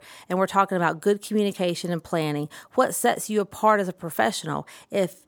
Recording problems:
none

